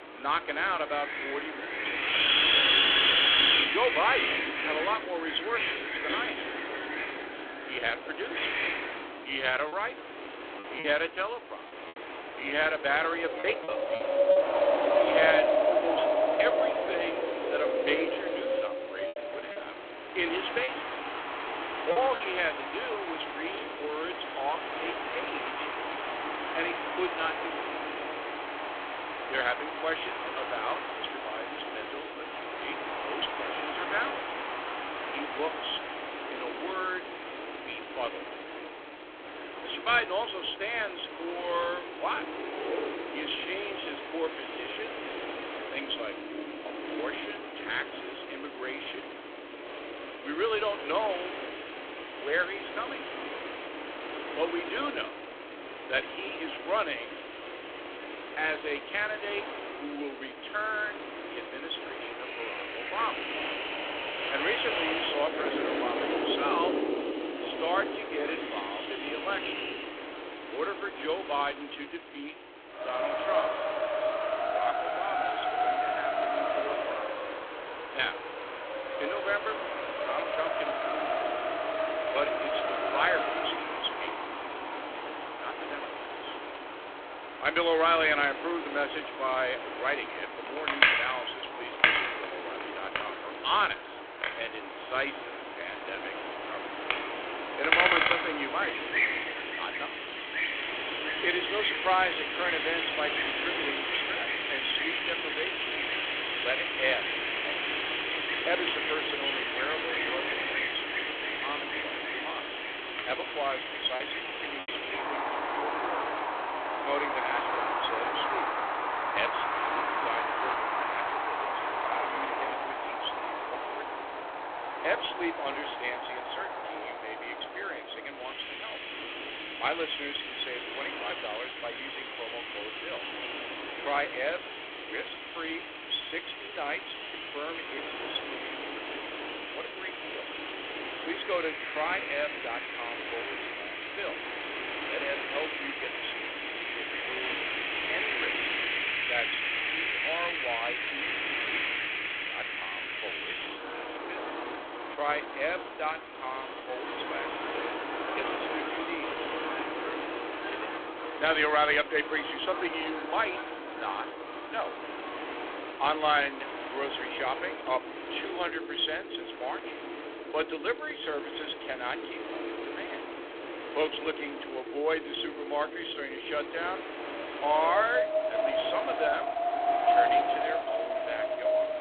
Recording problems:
phone-call audio; poor line
thin; somewhat; fading below 250 Hz
wind in the background; very loud; throughout; 1 dB above the speech
choppy; very; from 9.5 to 14 s, from 19 to 22 s and at 1:54; 7% of the speech affected

